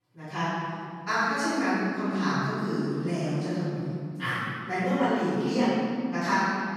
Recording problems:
room echo; strong; dies away in 2.3 s
off-mic speech; far

